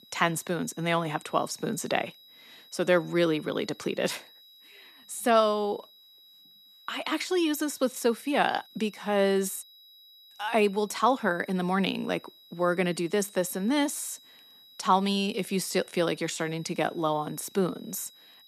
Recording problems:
high-pitched whine; faint; throughout; 4 kHz, 25 dB below the speech

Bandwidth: 14 kHz